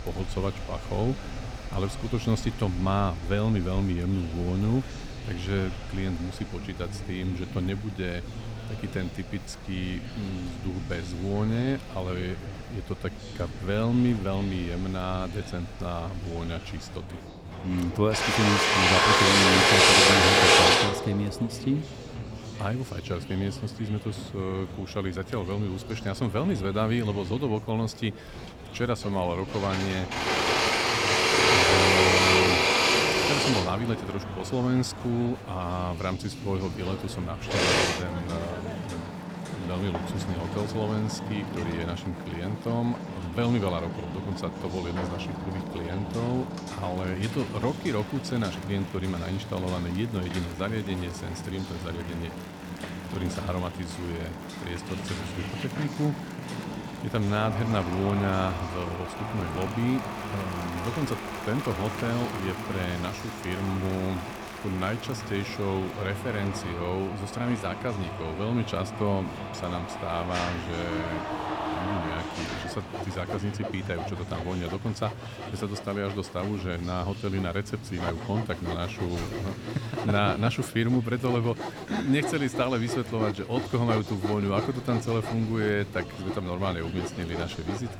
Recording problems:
machinery noise; very loud; throughout; 3 dB above the speech
murmuring crowd; noticeable; throughout; 10 dB below the speech

